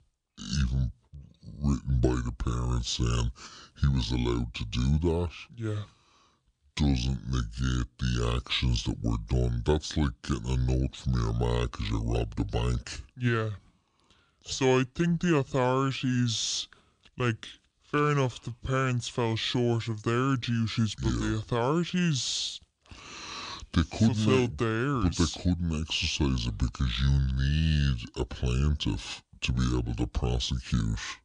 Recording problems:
wrong speed and pitch; too slow and too low; 0.6 times normal speed

